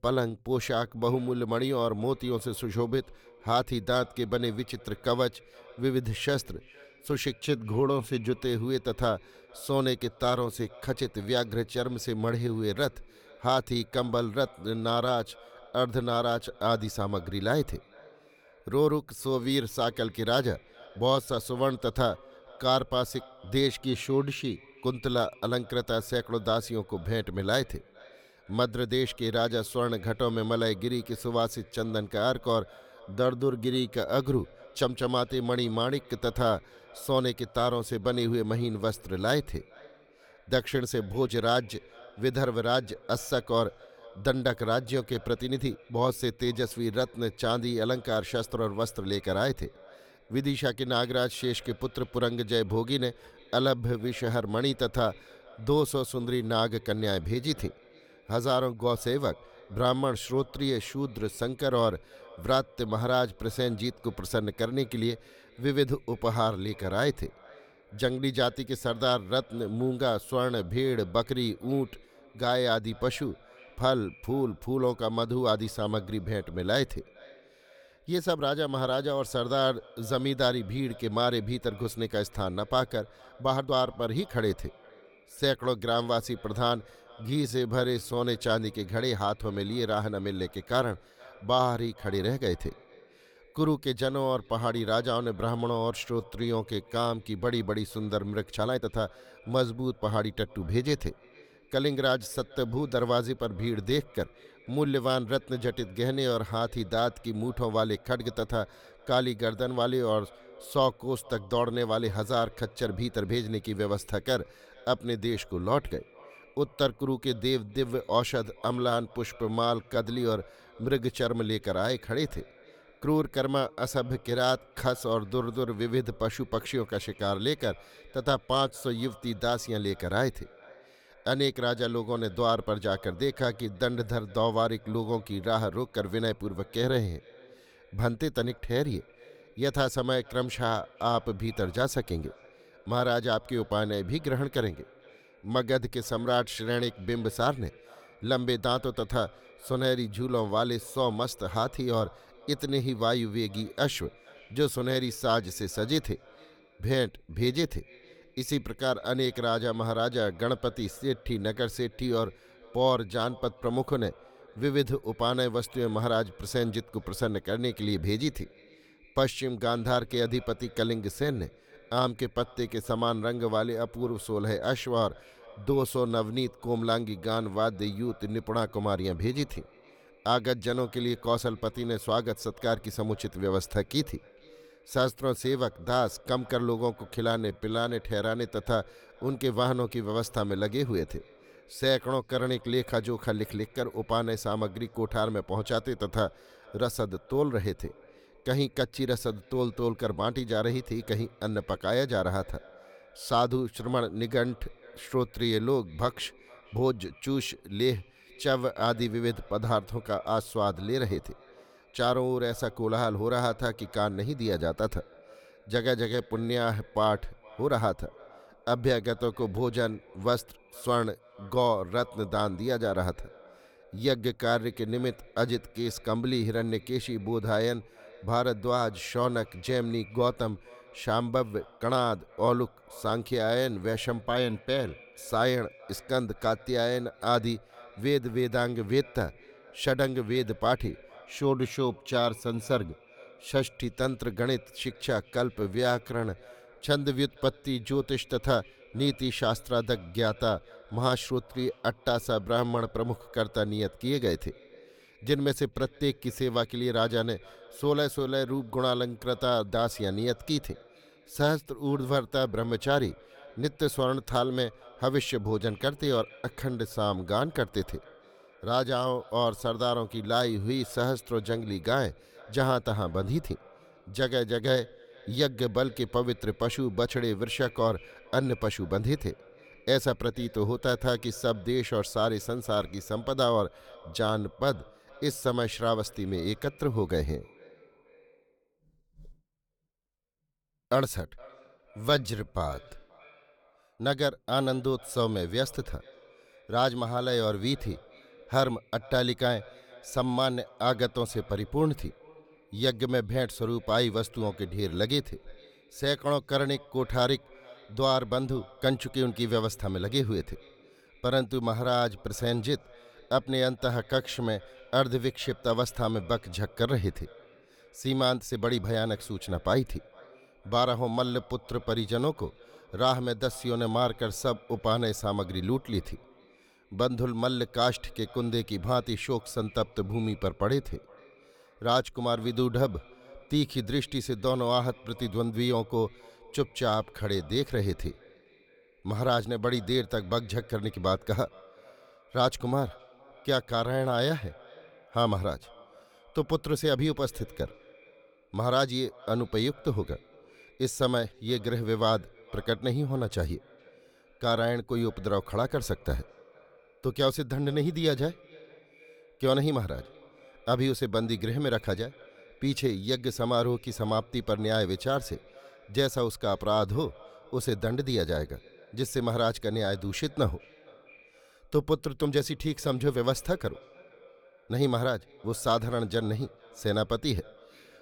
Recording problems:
echo of what is said; faint; throughout; 460 ms later, 25 dB below the speech
uneven, jittery; strongly; from 45 s to 6:12

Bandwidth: 18.5 kHz